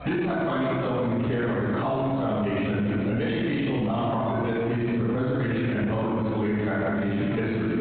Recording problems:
room echo; strong; dies away in 1.9 s
off-mic speech; far
high frequencies cut off; severe; nothing above 4 kHz
squashed, flat; somewhat
electrical hum; faint; throughout; 60 Hz, 30 dB below the speech
voice in the background; faint; throughout; 25 dB below the speech

